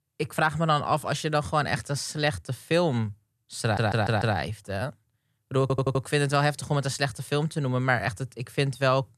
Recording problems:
audio stuttering; at 3.5 s and at 5.5 s

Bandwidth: 14 kHz